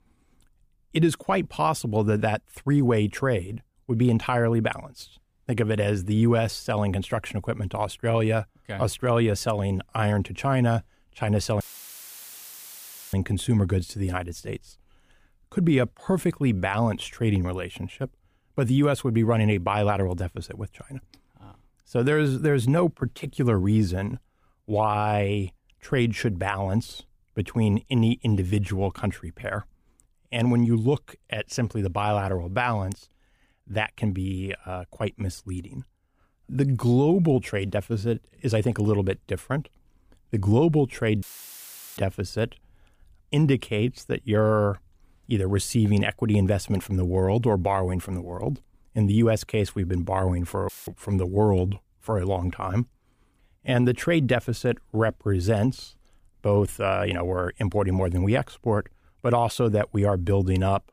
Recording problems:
audio cutting out; filled with static; at 12 s for 1.5 s, at 41 s for 1 s and at 51 s

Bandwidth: 15 kHz